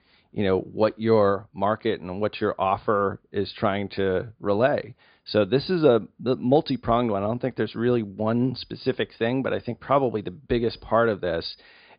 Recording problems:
high frequencies cut off; severe; nothing above 5 kHz

